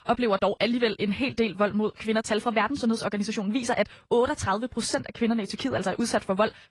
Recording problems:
wrong speed, natural pitch; too fast; 1.5 times normal speed
garbled, watery; slightly; nothing above 10.5 kHz

